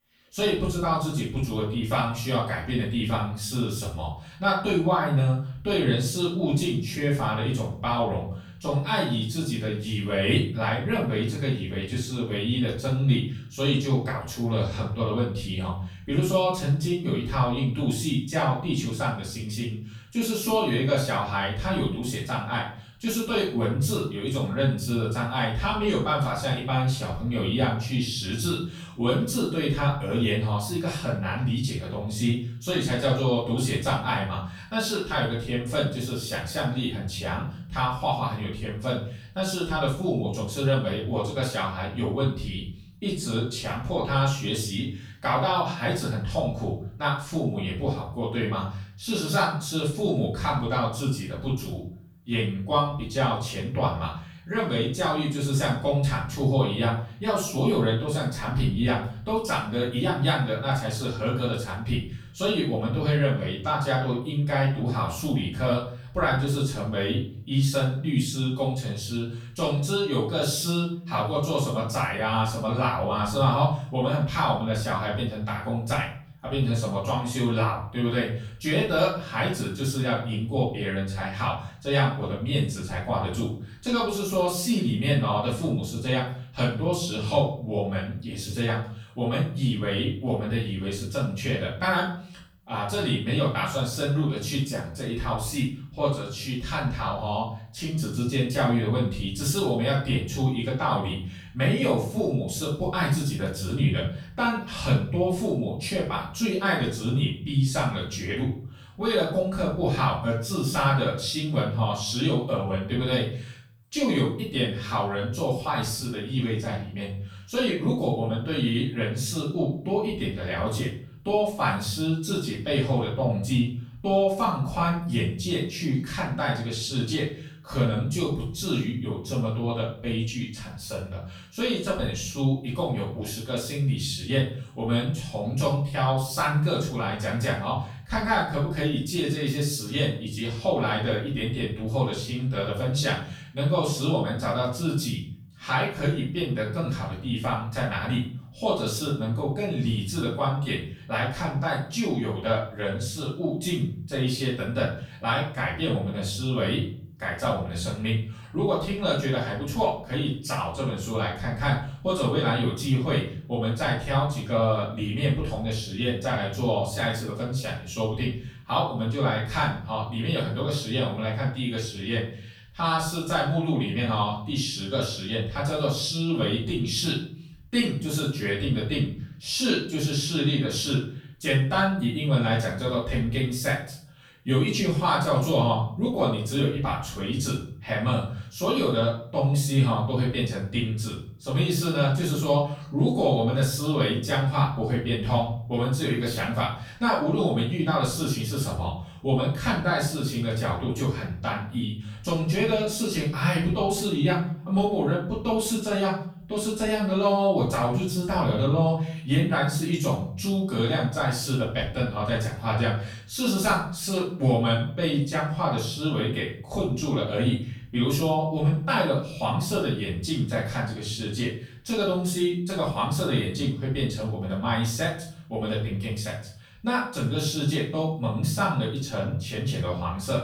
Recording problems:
off-mic speech; far
room echo; noticeable; dies away in 0.5 s

